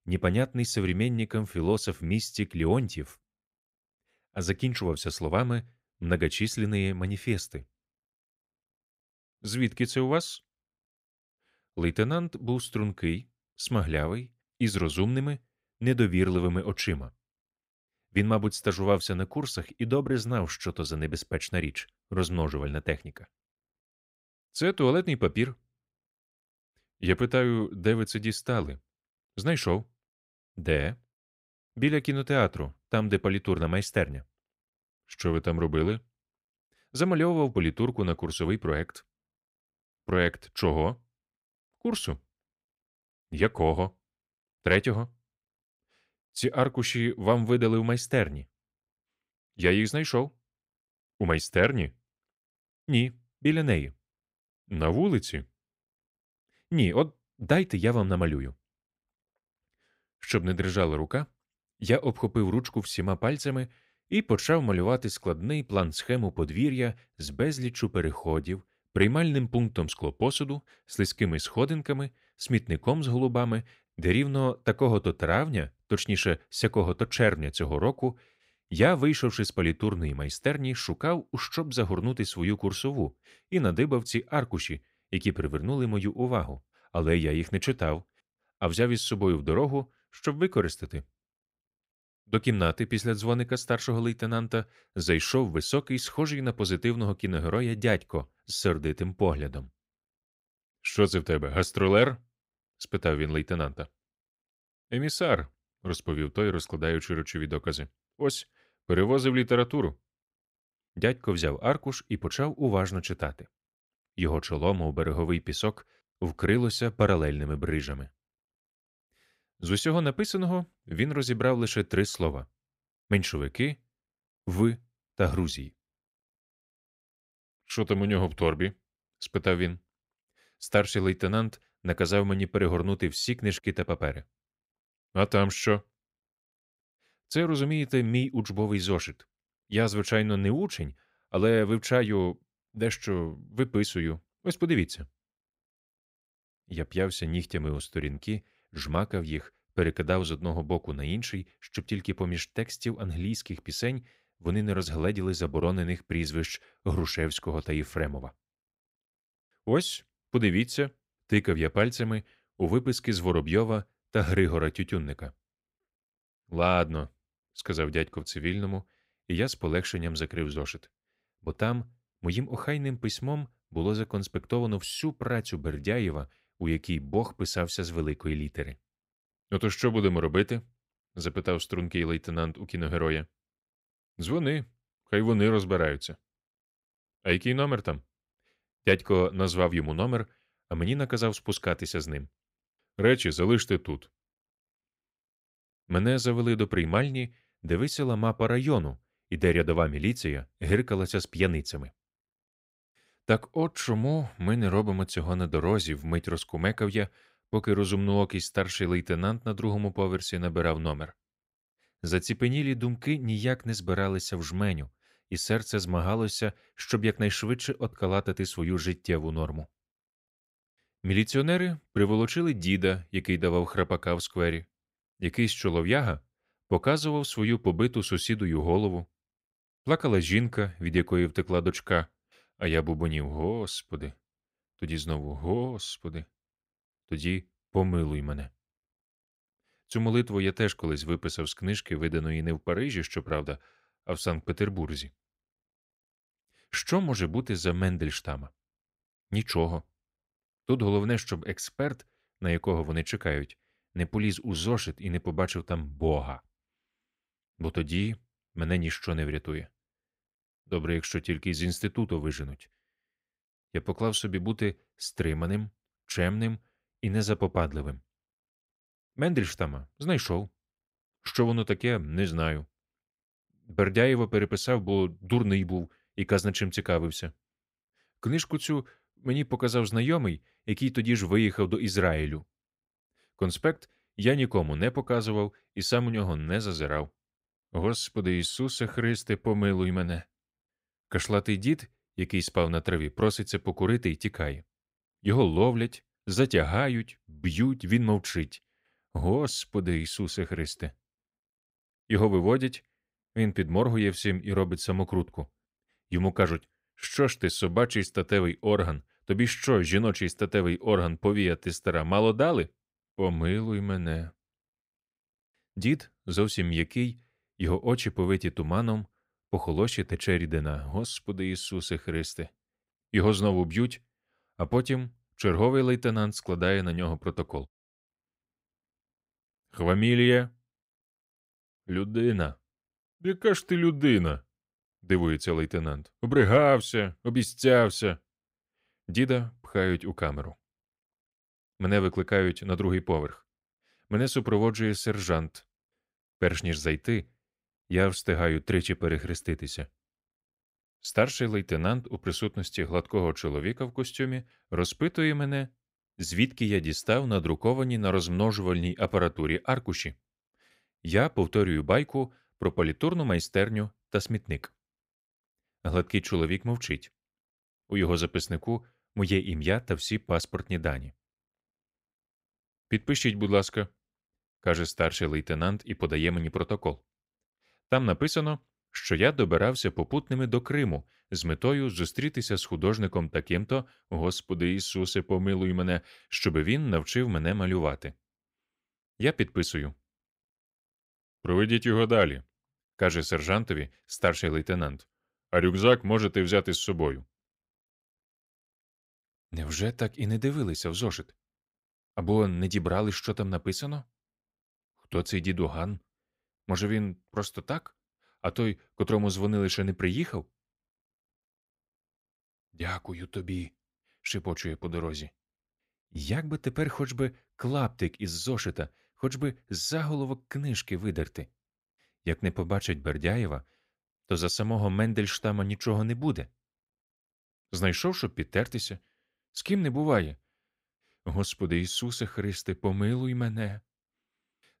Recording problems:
none

